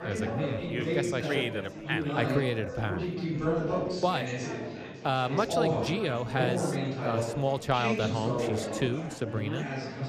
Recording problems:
chatter from many people; loud; throughout; 1 dB below the speech

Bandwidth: 14.5 kHz